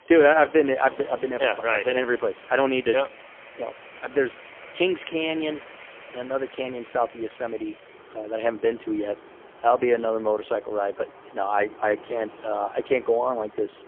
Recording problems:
phone-call audio; poor line; nothing above 3 kHz
traffic noise; noticeable; throughout; 20 dB below the speech

